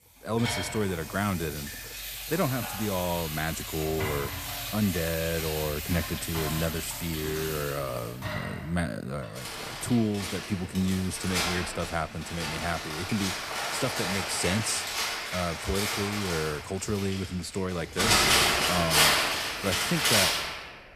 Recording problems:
household noises; very loud; throughout; 2 dB above the speech

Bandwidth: 14.5 kHz